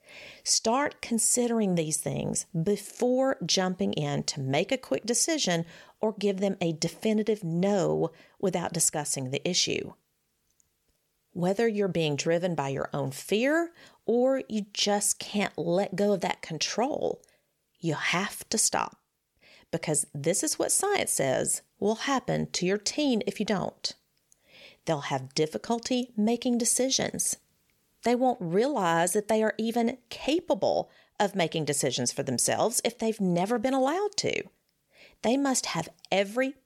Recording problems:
none

